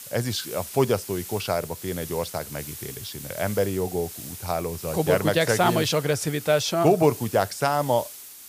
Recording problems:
hiss; noticeable; throughout; 10 dB below the speech

